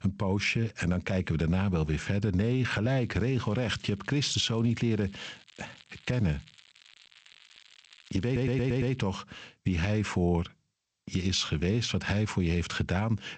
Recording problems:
garbled, watery; slightly; nothing above 8 kHz
squashed, flat; somewhat
crackling; faint; from 3 to 9 s; 25 dB below the speech
audio stuttering; at 8.5 s

